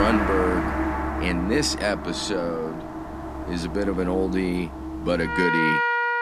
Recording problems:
background music; loud; throughout; 1 dB below the speech
abrupt cut into speech; at the start

